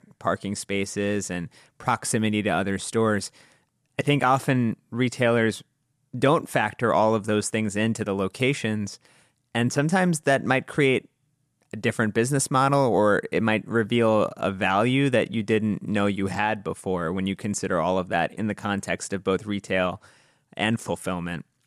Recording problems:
none

